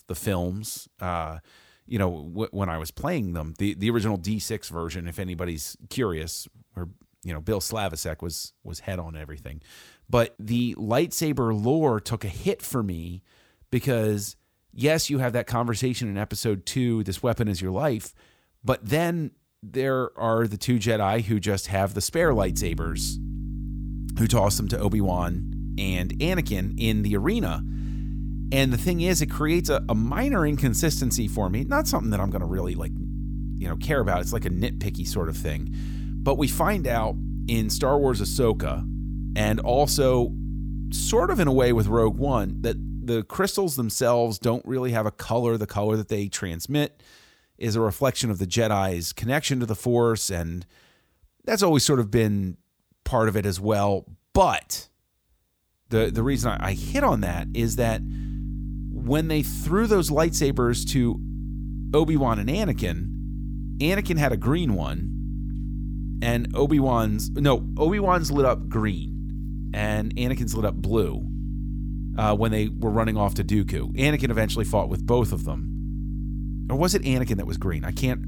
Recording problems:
electrical hum; noticeable; from 22 to 43 s and from 56 s on; 50 Hz, 15 dB below the speech

